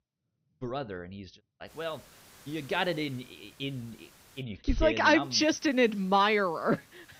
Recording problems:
high frequencies cut off; noticeable; nothing above 6 kHz
hiss; faint; from 1.5 to 4.5 s and from 5 s on; 25 dB below the speech

